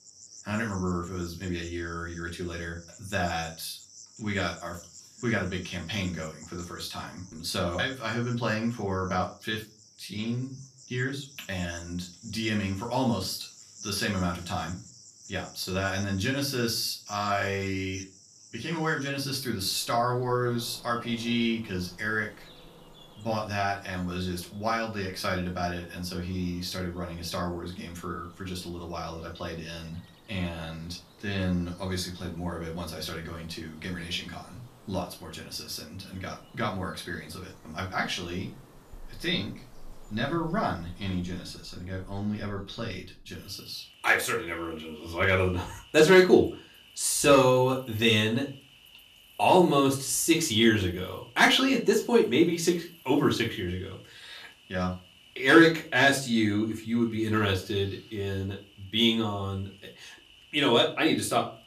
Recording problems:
off-mic speech; far
room echo; very slight; dies away in 0.3 s
animal sounds; faint; throughout; 25 dB below the speech

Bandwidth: 14.5 kHz